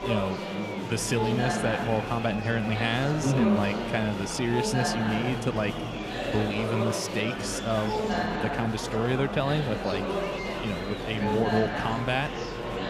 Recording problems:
murmuring crowd; loud; throughout; 2 dB below the speech

